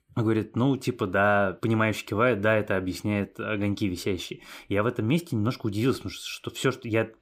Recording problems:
none

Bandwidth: 15.5 kHz